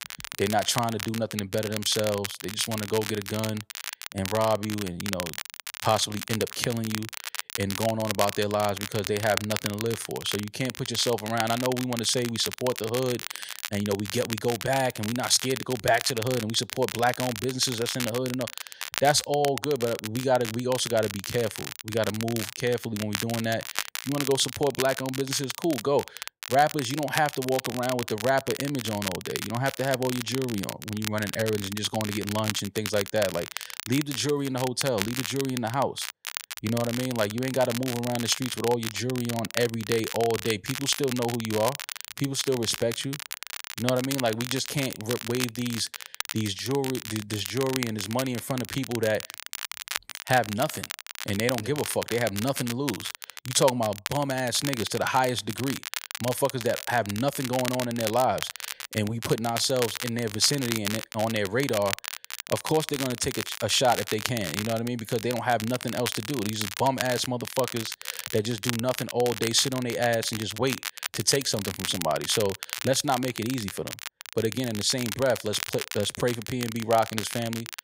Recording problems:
crackle, like an old record; loud; 7 dB below the speech

